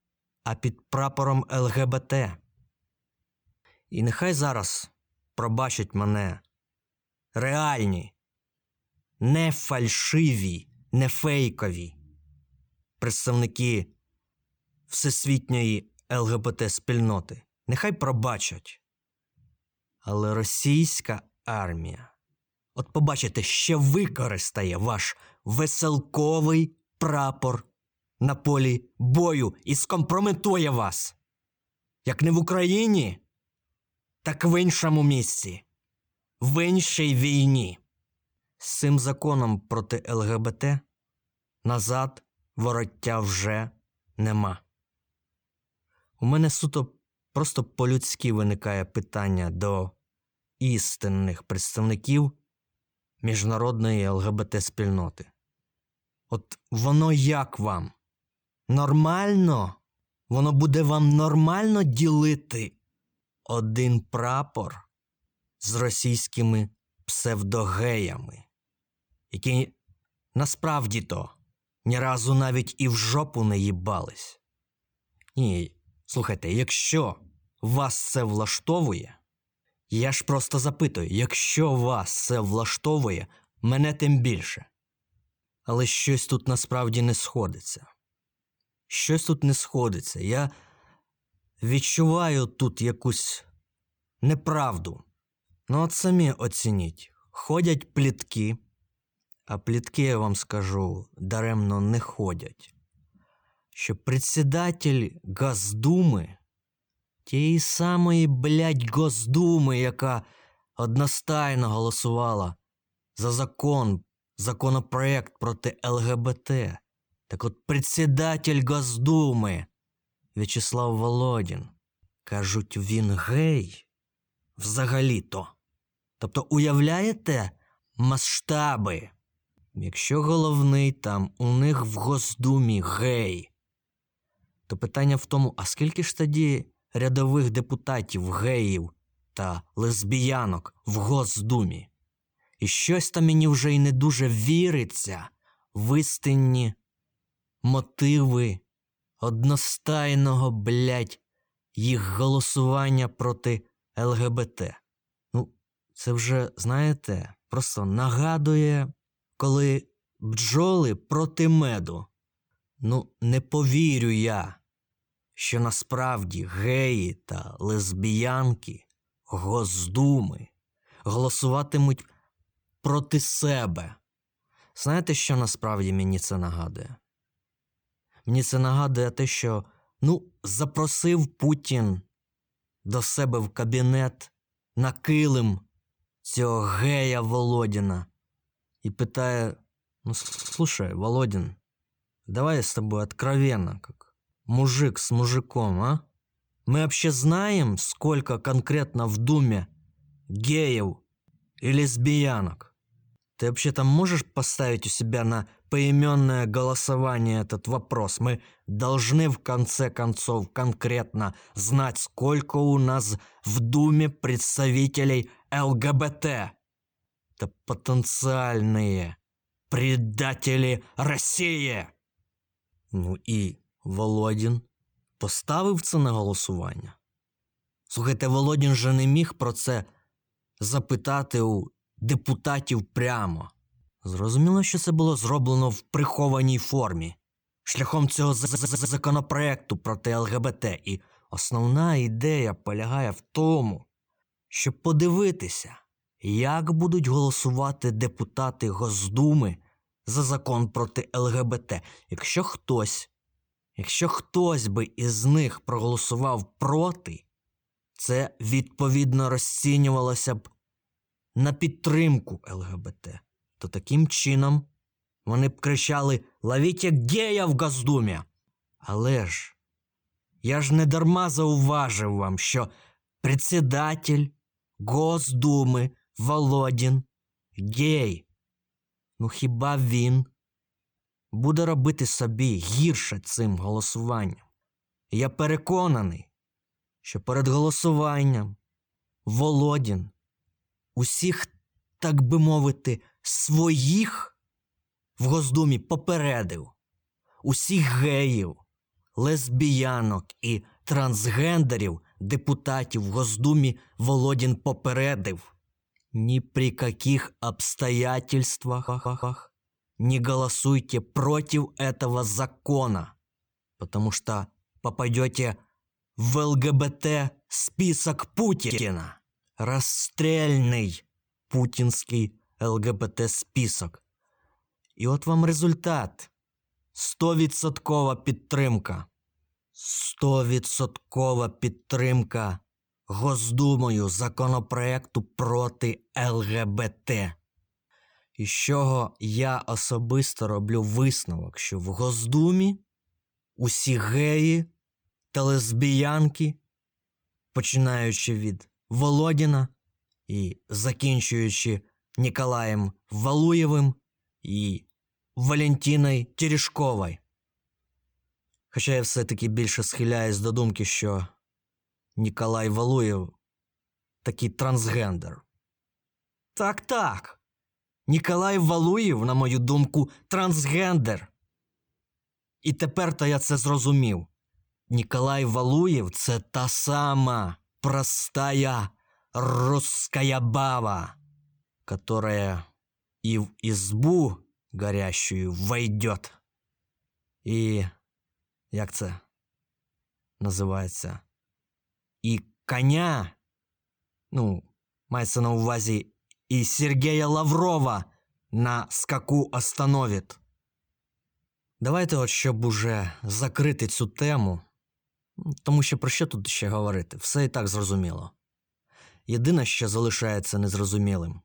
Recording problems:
audio stuttering; 4 times, first at 3:10

